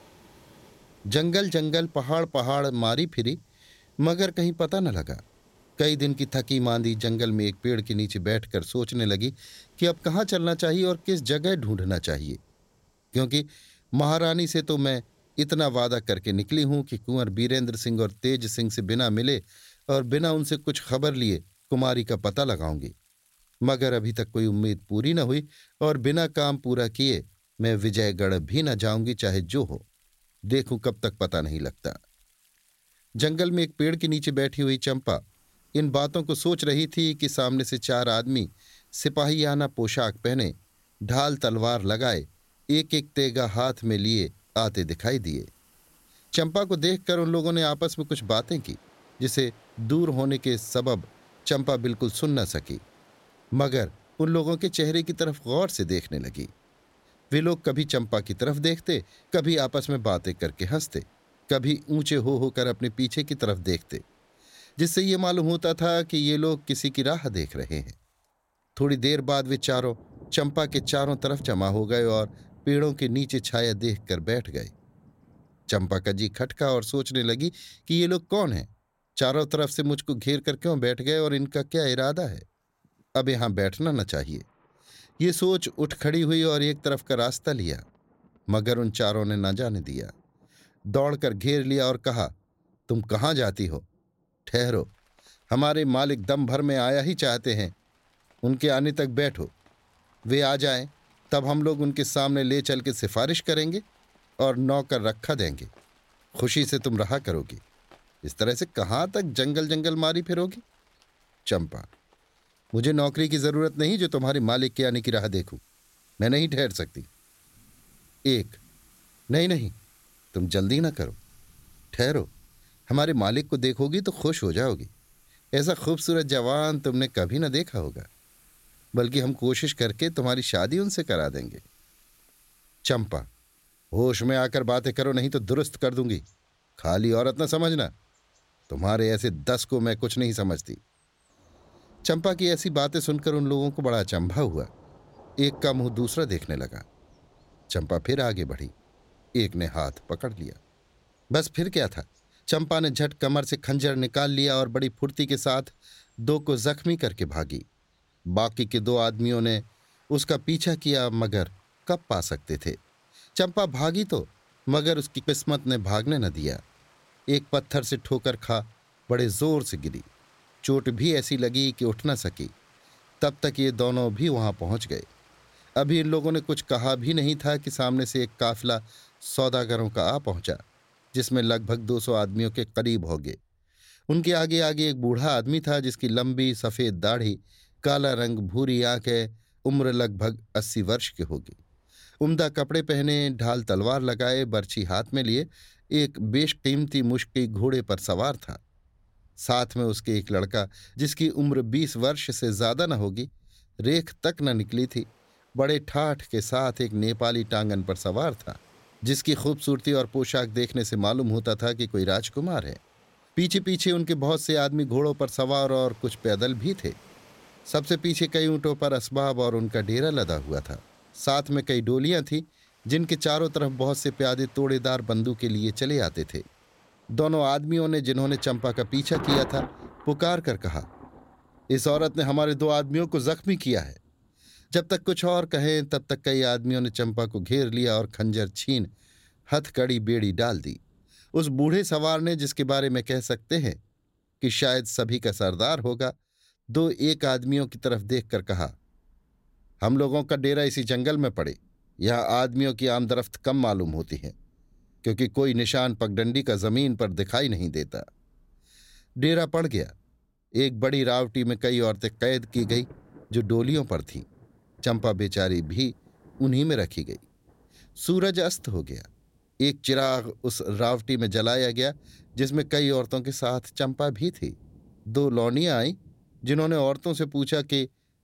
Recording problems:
rain or running water; faint; throughout; 25 dB below the speech

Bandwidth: 16.5 kHz